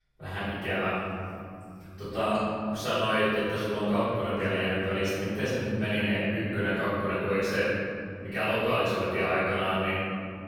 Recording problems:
room echo; strong; dies away in 3 s
off-mic speech; far

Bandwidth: 17.5 kHz